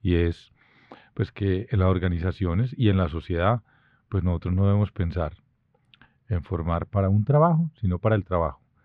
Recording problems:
muffled; very; fading above 1.5 kHz

